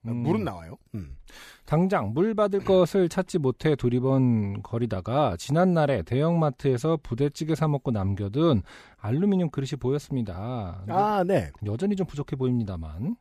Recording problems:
none

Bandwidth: 15 kHz